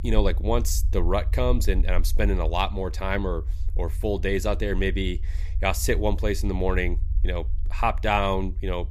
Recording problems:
low rumble; faint; throughout; 25 dB below the speech

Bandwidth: 15 kHz